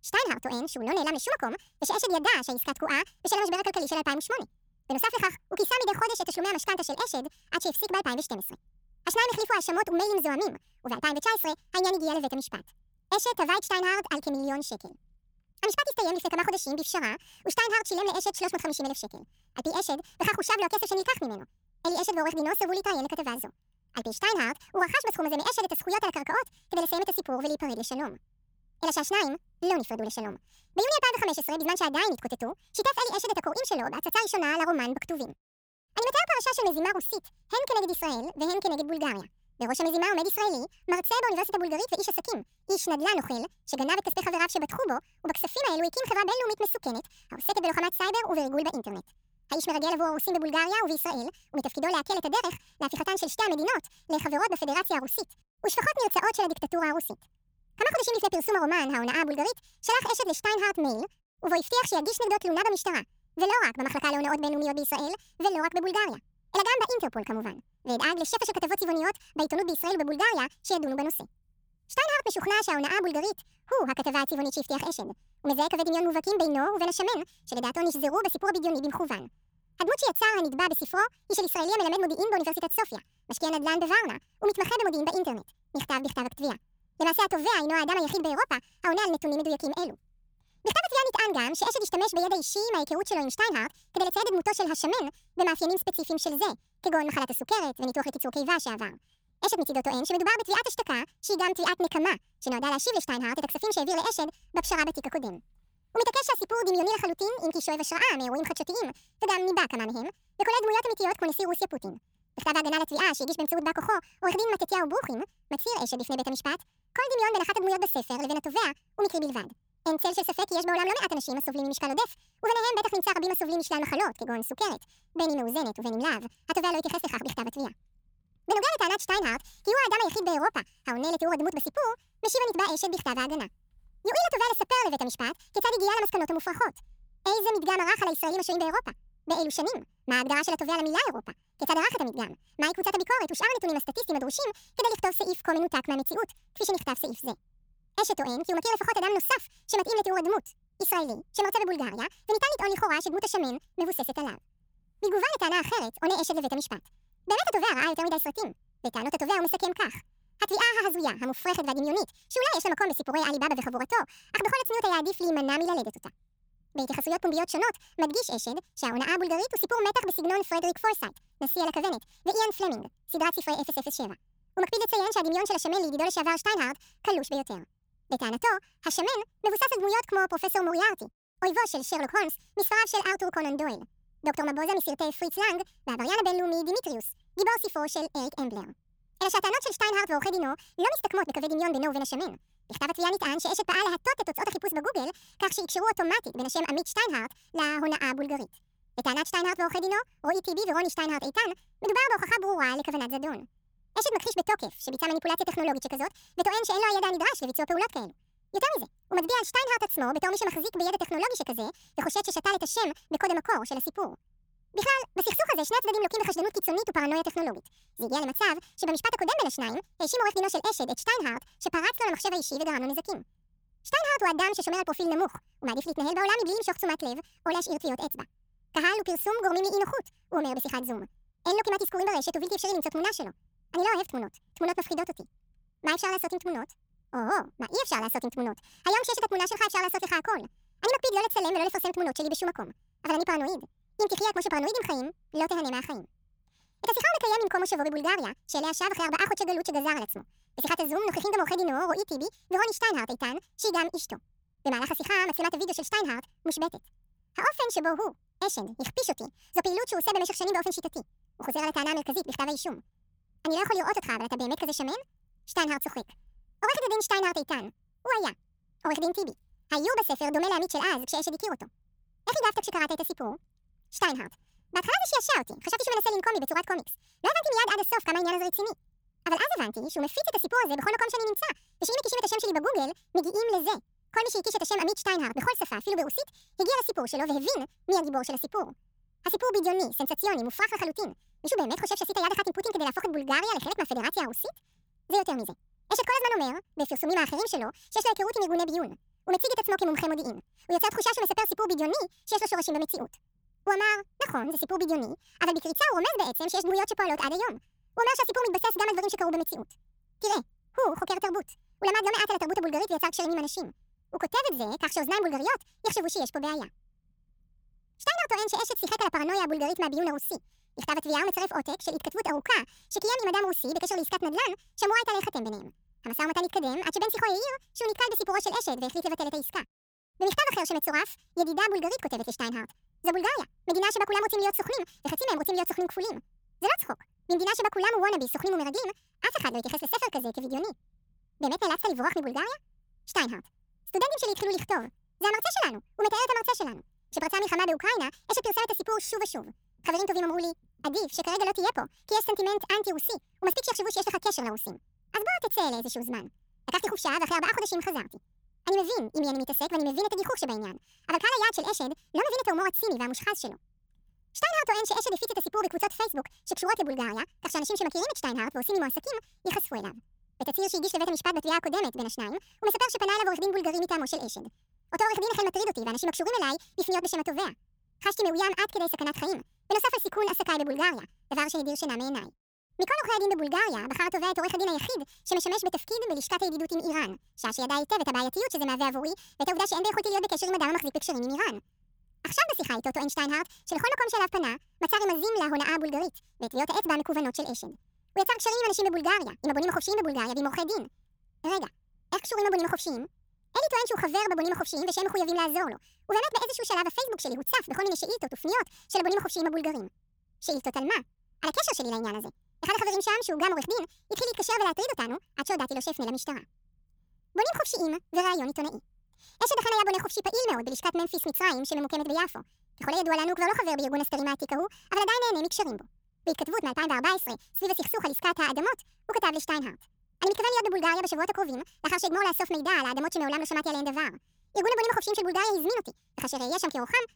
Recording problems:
wrong speed and pitch; too fast and too high; 1.6 times normal speed

